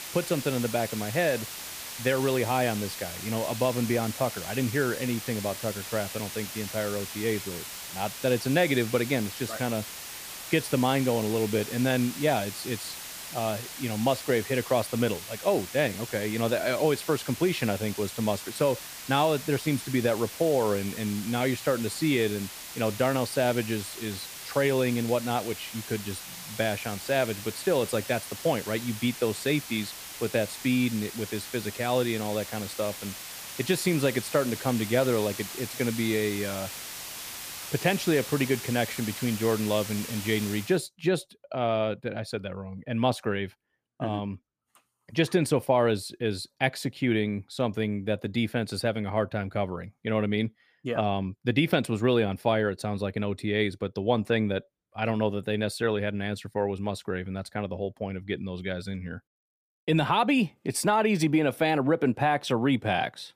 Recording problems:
hiss; loud; until 41 s; 9 dB below the speech

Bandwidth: 15 kHz